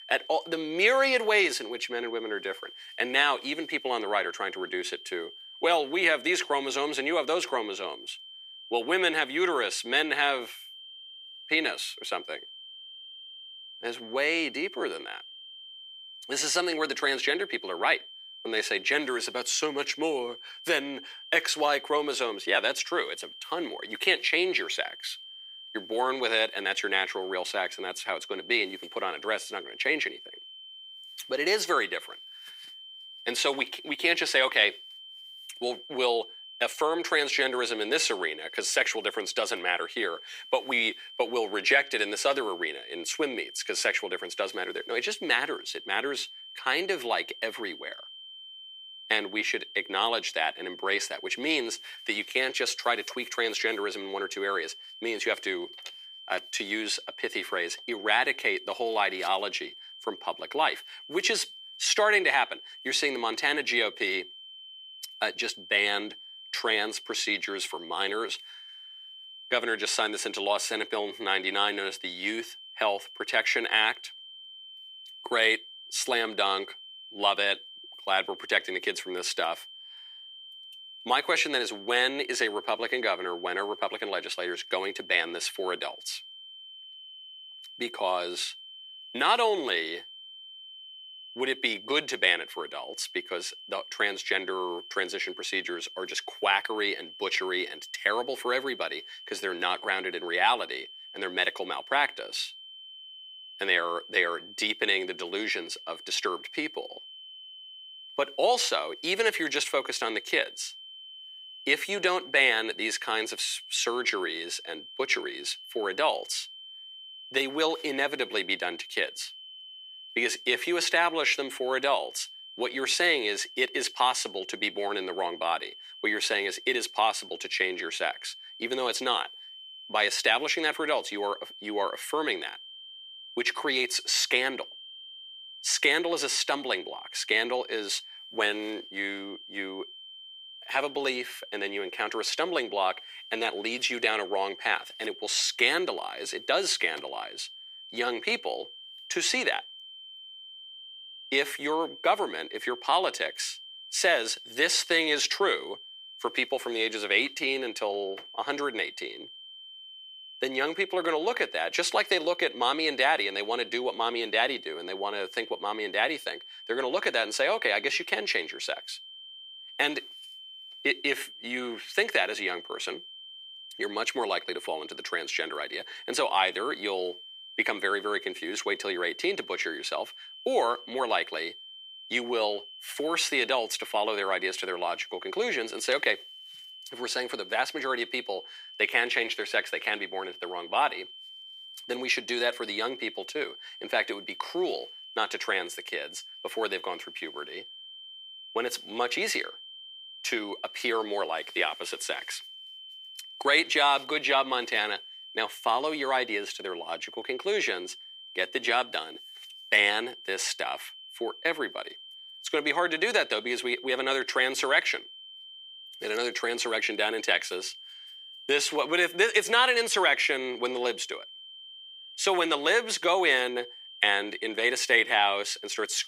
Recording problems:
thin; very; fading below 350 Hz
high-pitched whine; noticeable; throughout; 3 kHz, 15 dB below the speech

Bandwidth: 15.5 kHz